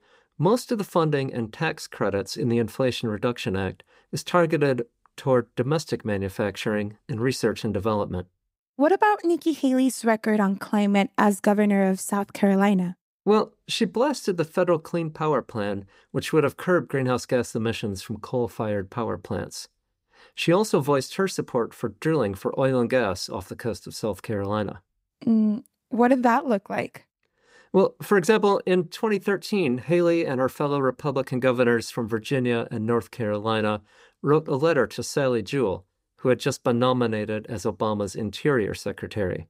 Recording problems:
none

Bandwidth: 15.5 kHz